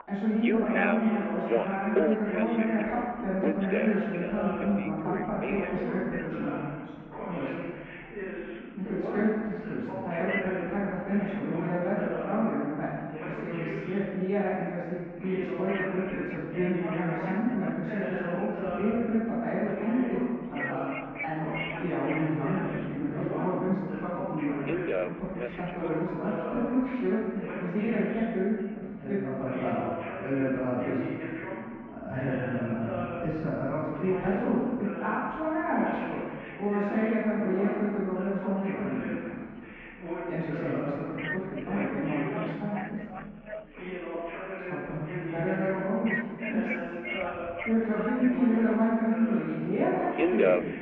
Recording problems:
room echo; strong; dies away in 1.6 s
off-mic speech; far
muffled; very; fading above 2 kHz
alarms or sirens; loud; throughout; 5 dB below the speech
background chatter; loud; throughout; 2 voices, 7 dB below the speech

